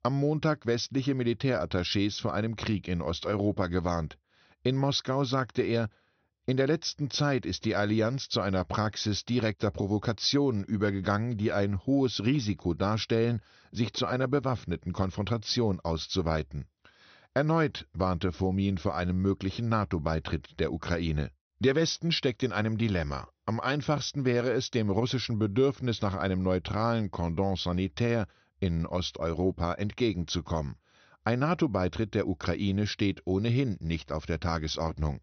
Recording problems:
high frequencies cut off; noticeable; nothing above 6 kHz

